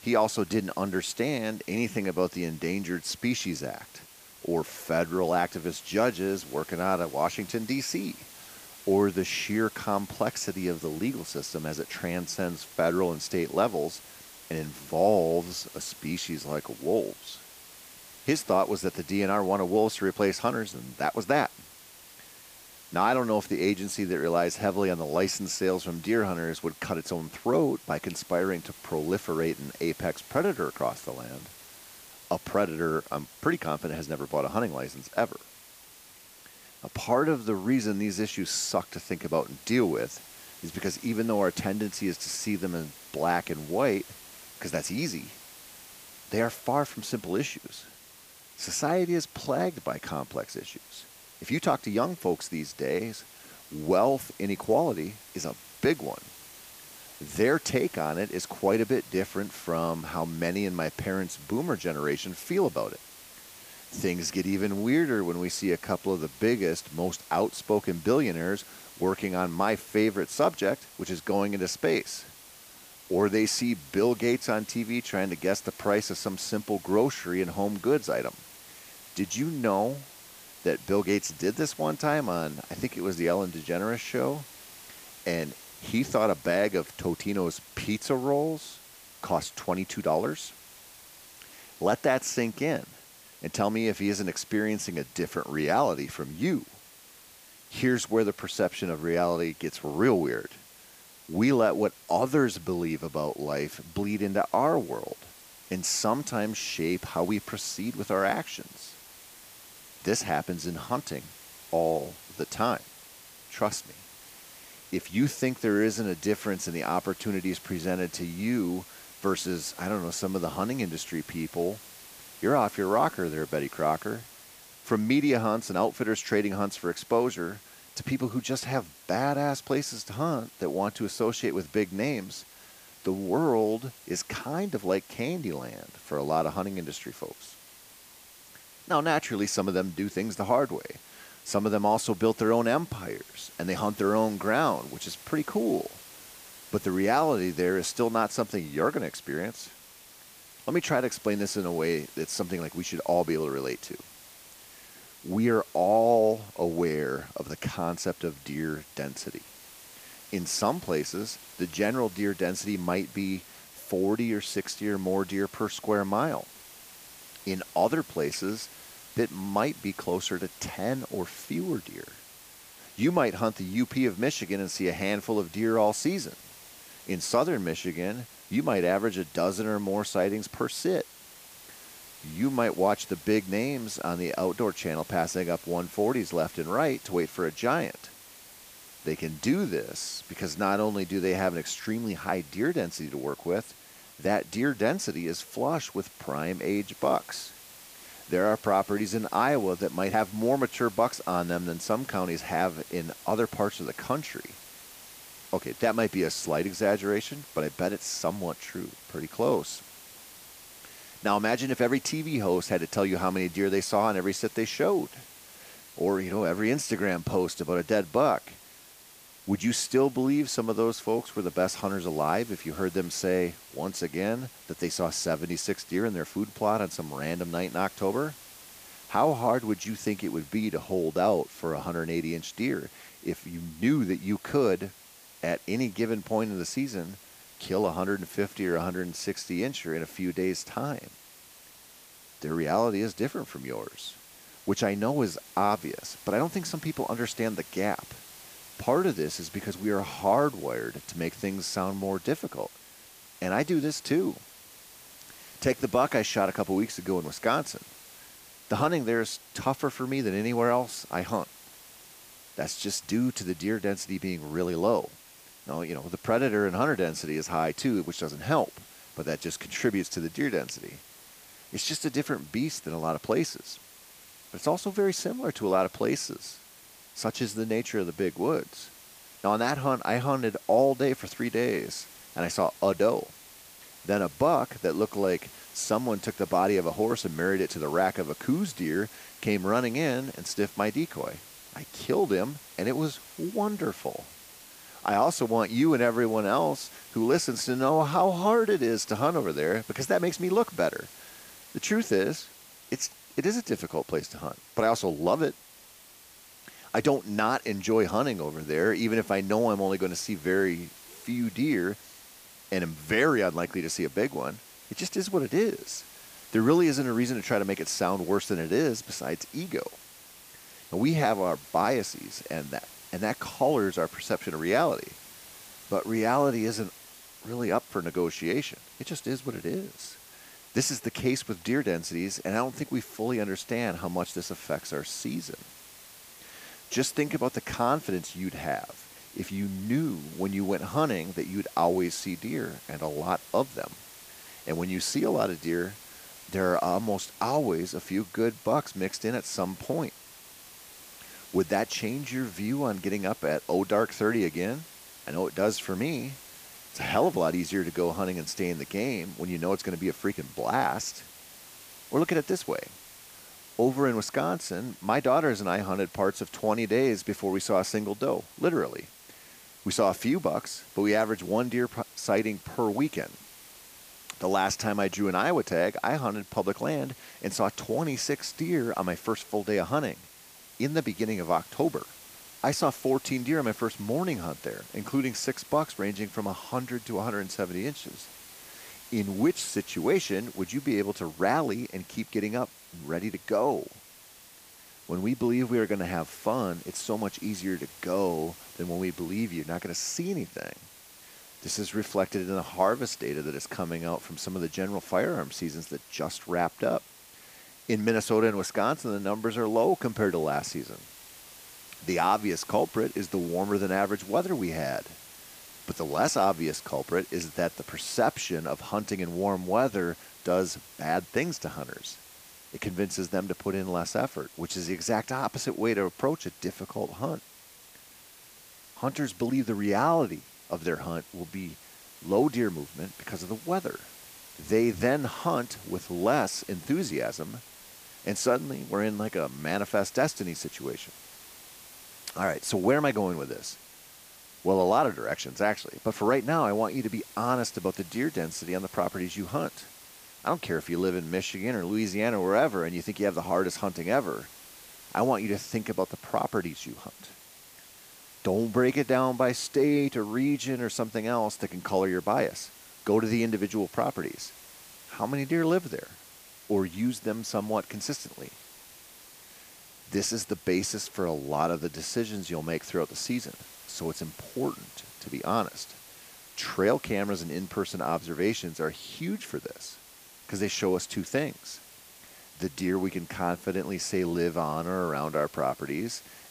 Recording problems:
hiss; noticeable; throughout; 20 dB below the speech

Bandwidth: 15 kHz